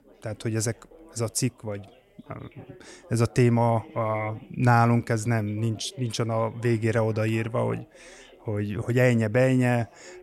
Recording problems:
background chatter; faint; throughout; 4 voices, 25 dB below the speech

